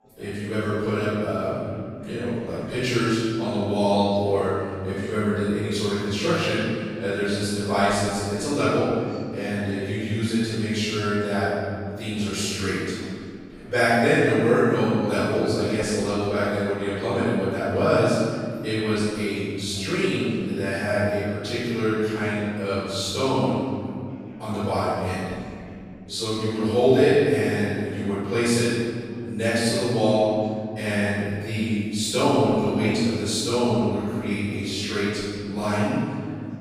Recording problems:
room echo; strong; dies away in 2.4 s
off-mic speech; far
chatter from many people; faint; throughout; 25 dB below the speech

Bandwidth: 15.5 kHz